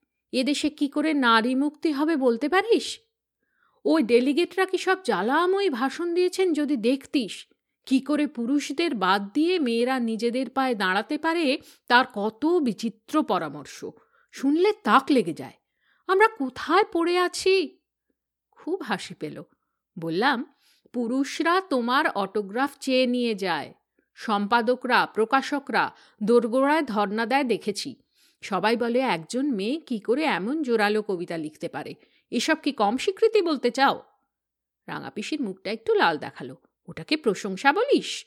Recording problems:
none

